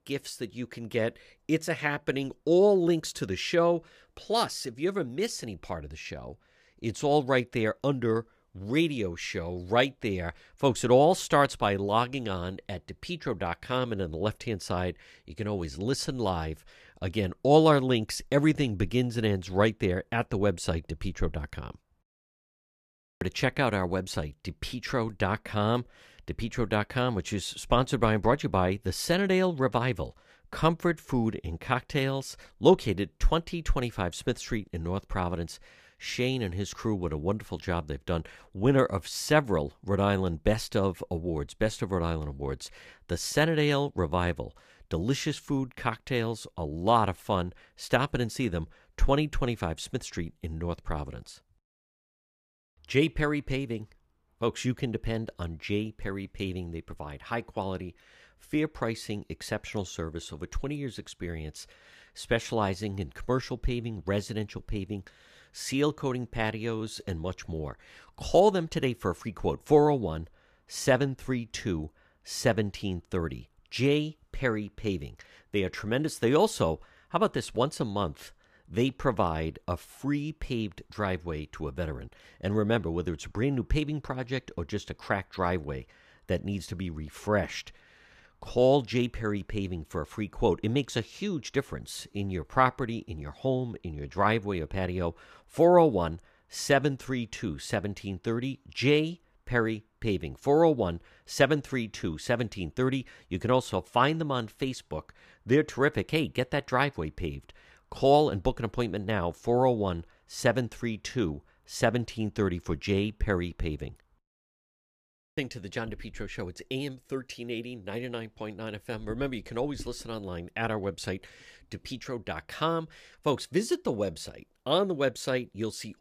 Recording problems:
none

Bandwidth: 14.5 kHz